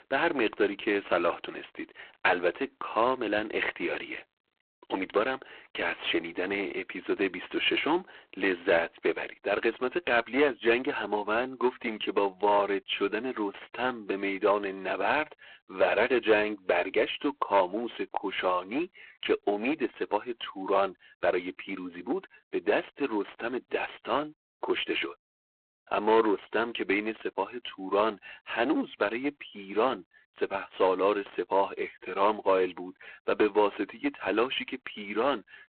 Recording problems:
phone-call audio; poor line
distortion; slight; 4% of the sound clipped

